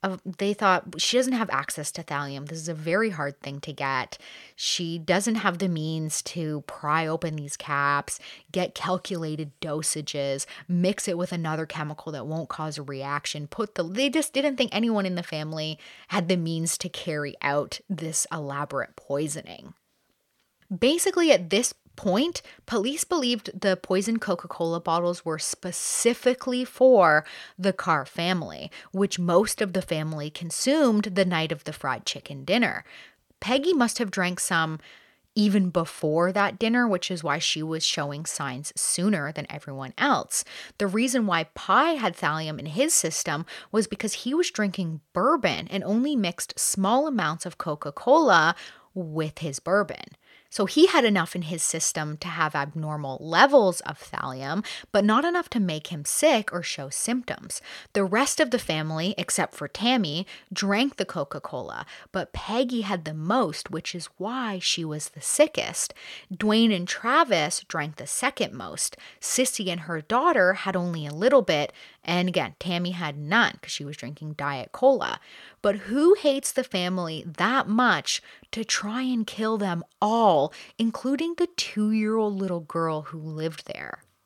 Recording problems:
none

